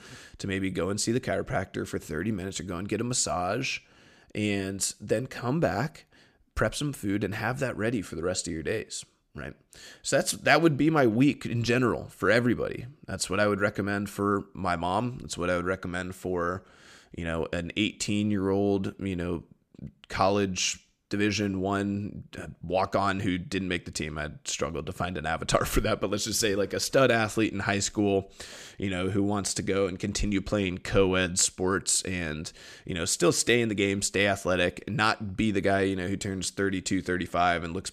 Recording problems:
none

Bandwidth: 14.5 kHz